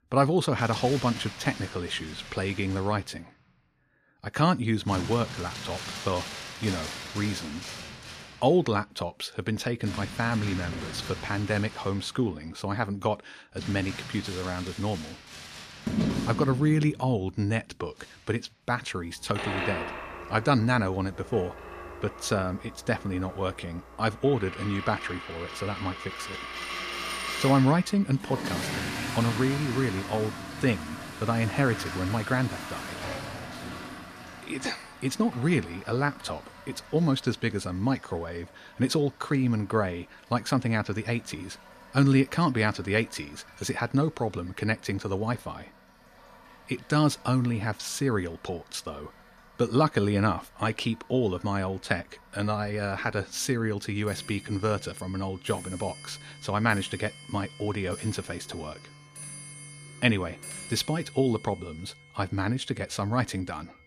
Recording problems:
household noises; loud; throughout; 9 dB below the speech

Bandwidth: 14.5 kHz